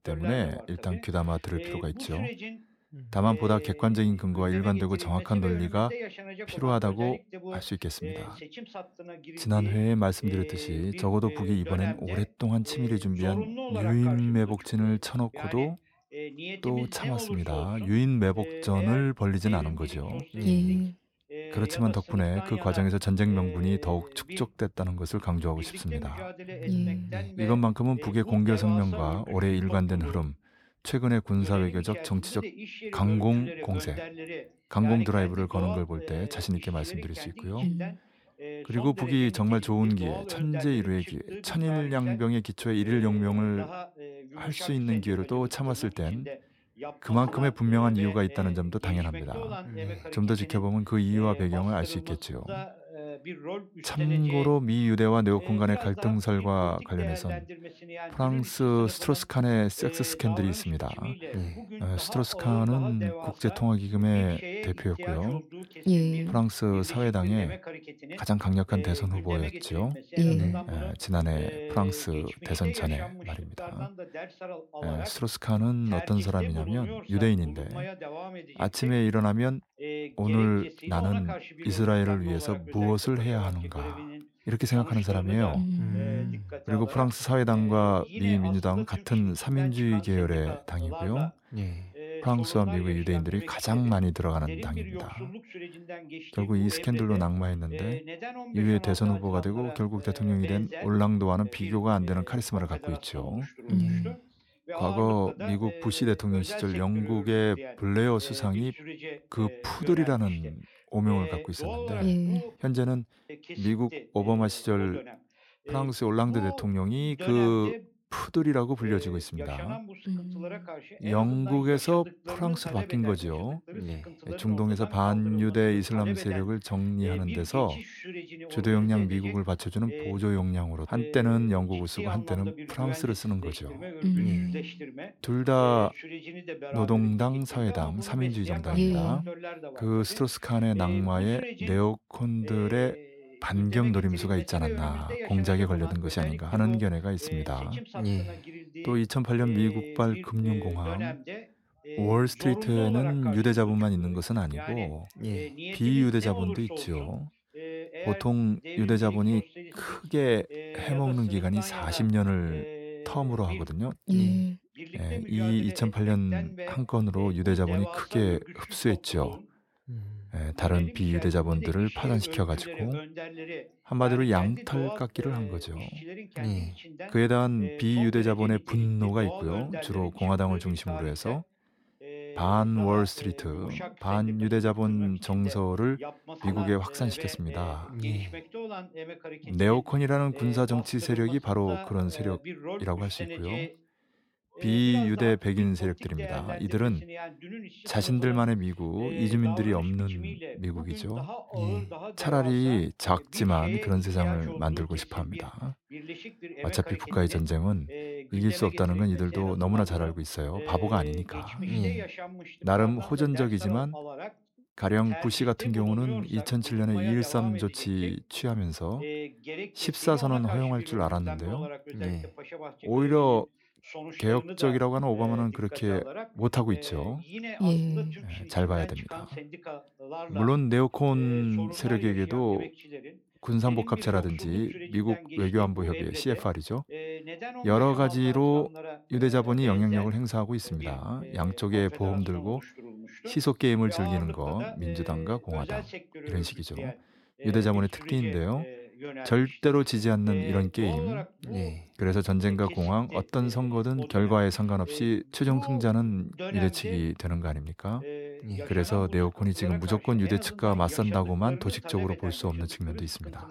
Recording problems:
voice in the background; noticeable; throughout; 15 dB below the speech

